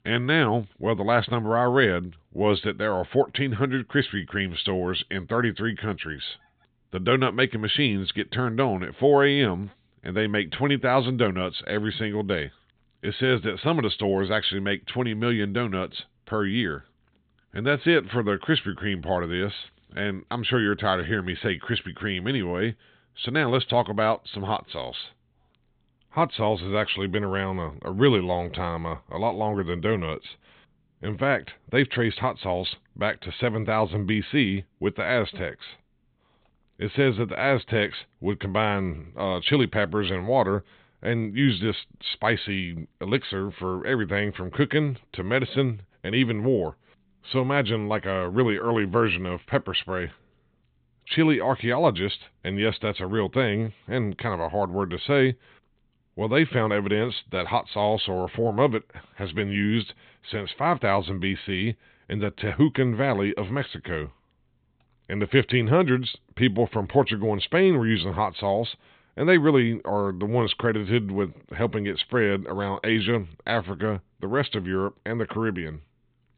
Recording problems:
high frequencies cut off; severe; nothing above 4 kHz

